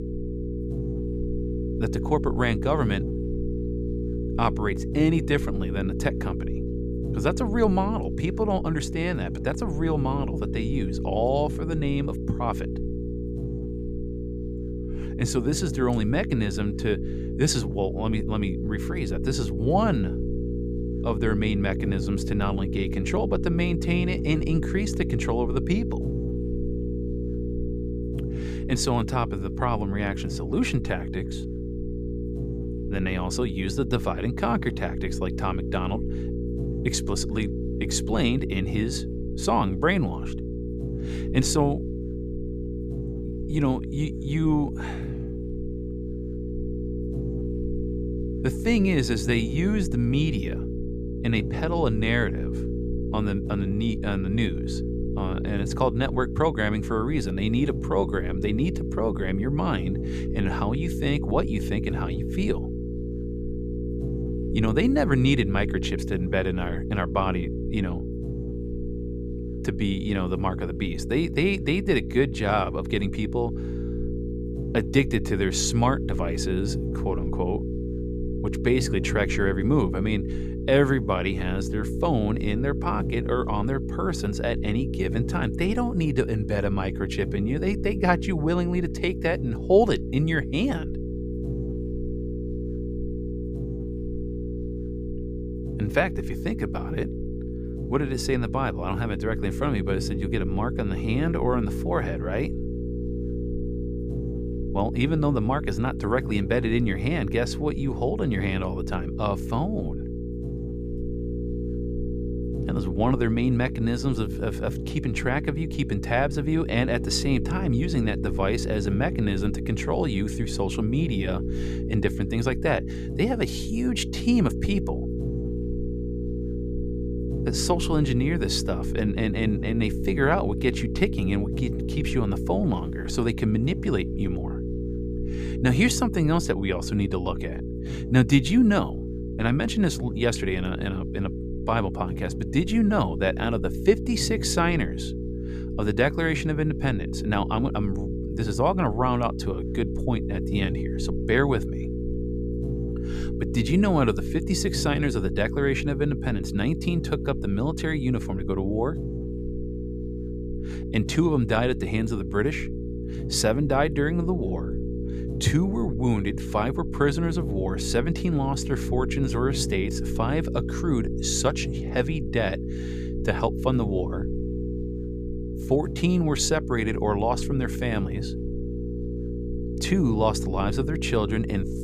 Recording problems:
electrical hum; loud; throughout; 60 Hz, 8 dB below the speech

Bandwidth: 14.5 kHz